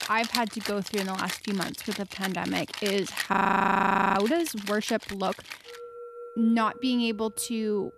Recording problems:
background music; loud; throughout; 9 dB below the speech
audio freezing; at 3.5 s for 1 s

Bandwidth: 14 kHz